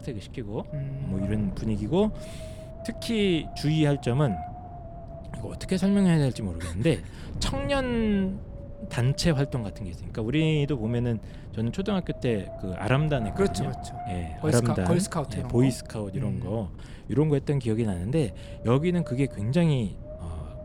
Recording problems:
wind noise on the microphone; occasional gusts; 10 dB below the speech

